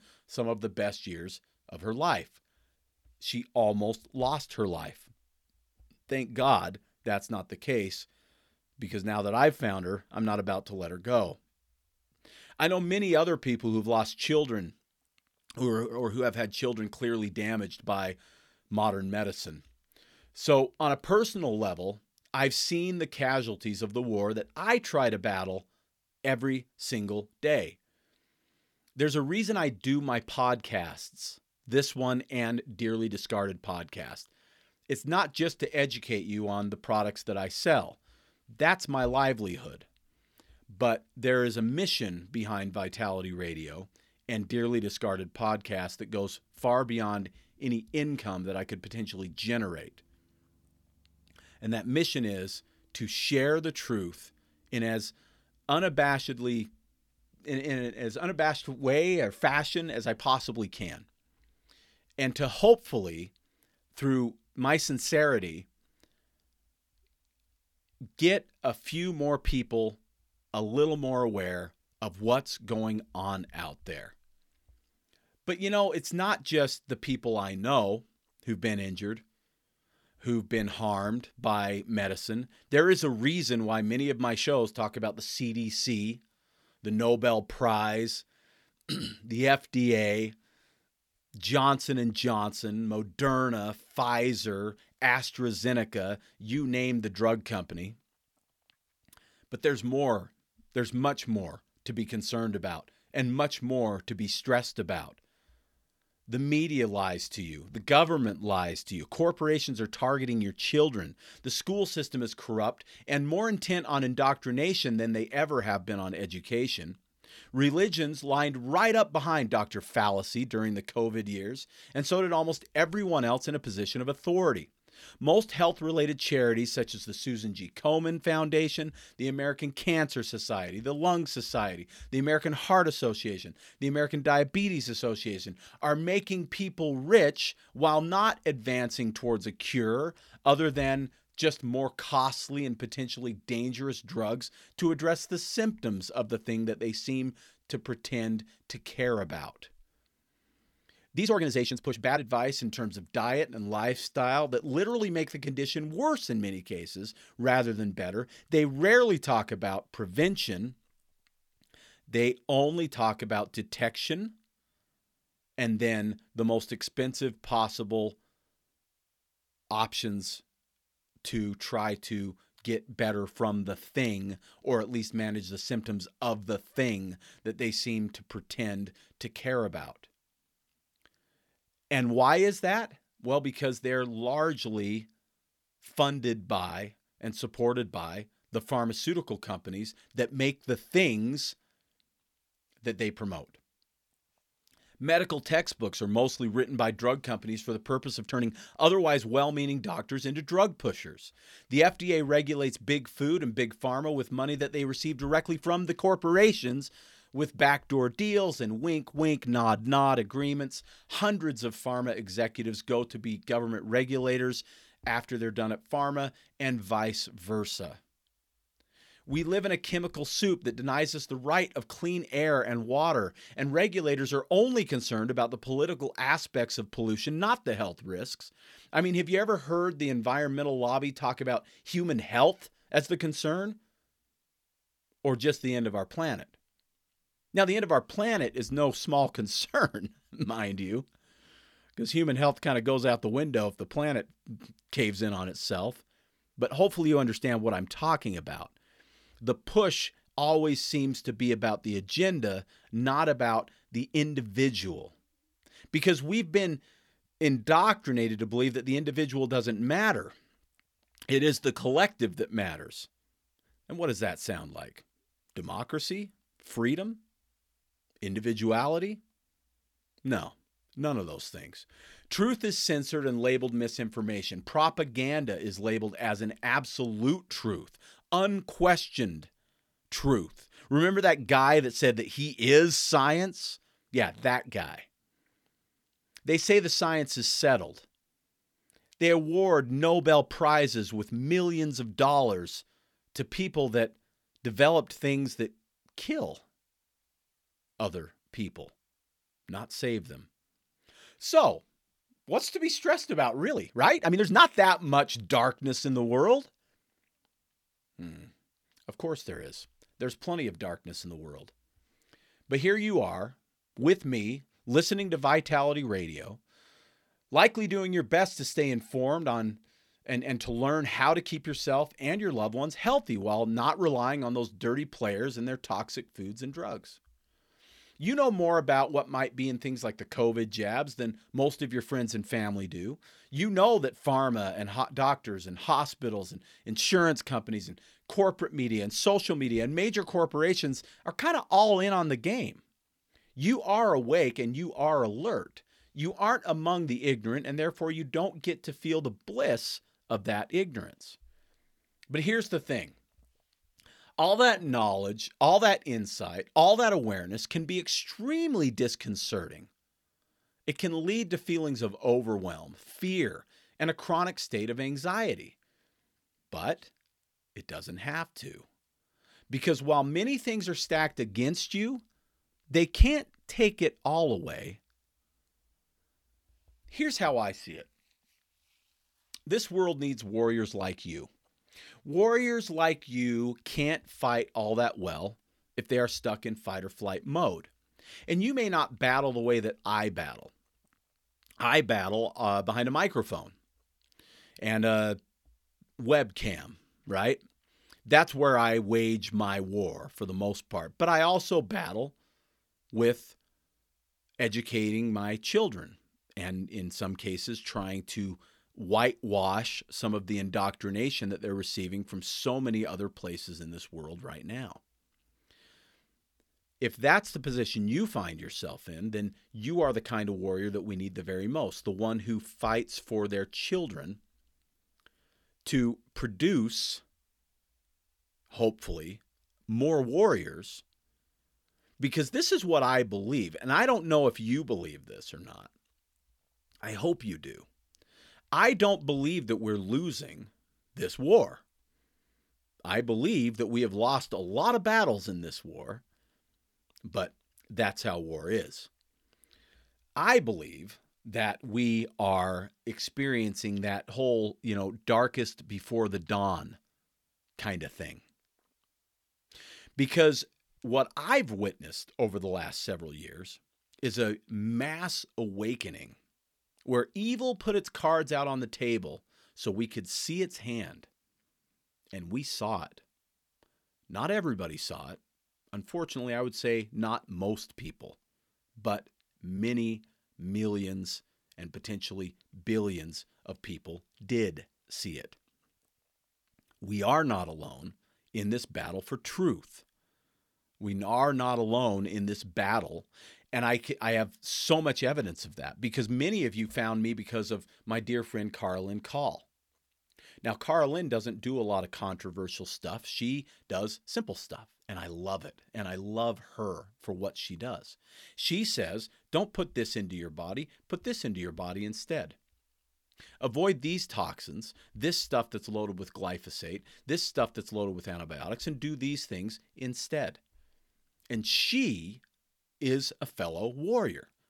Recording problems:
uneven, jittery; strongly; from 32 s to 8:25

